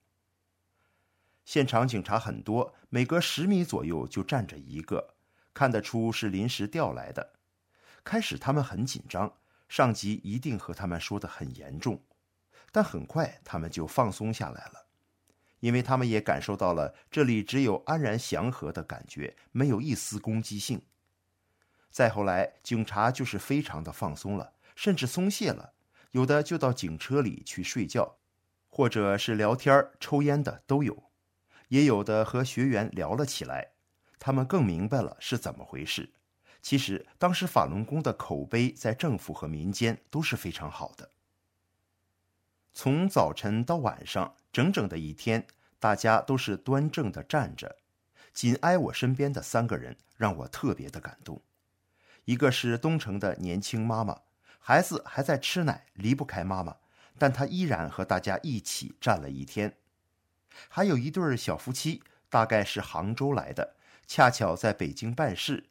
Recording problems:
none

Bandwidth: 16 kHz